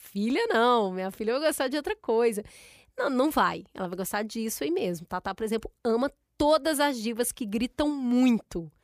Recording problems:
none

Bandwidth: 15 kHz